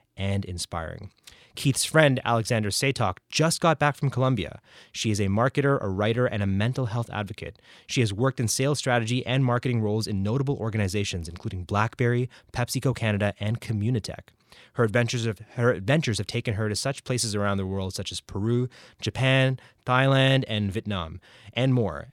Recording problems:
none

